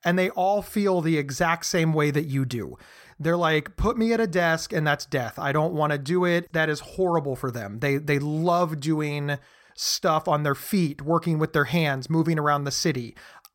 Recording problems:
none

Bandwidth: 16.5 kHz